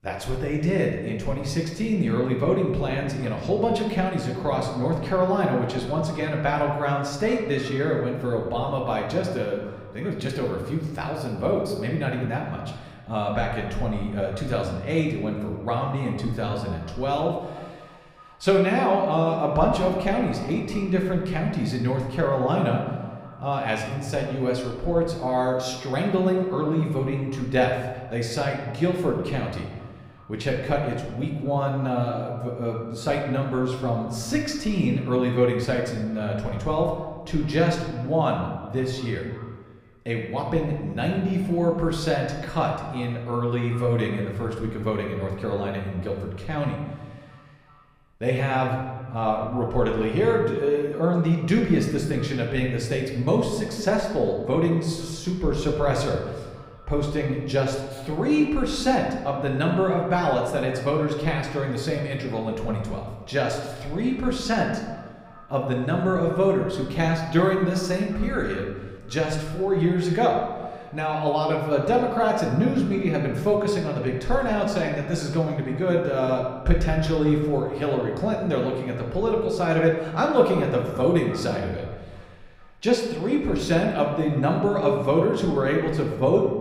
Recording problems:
echo of what is said; faint; throughout; 370 ms later, 25 dB below the speech
room echo; slight; dies away in 1 s
off-mic speech; somewhat distant

